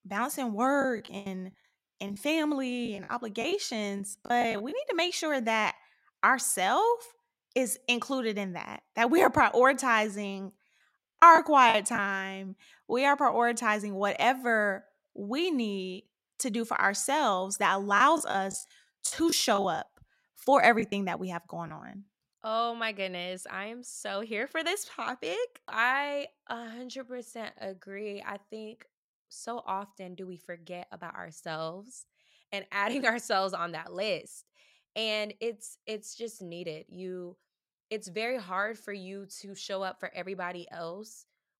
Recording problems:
choppy; very; from 1 to 4.5 s, at 11 s and from 18 to 22 s; 12% of the speech affected

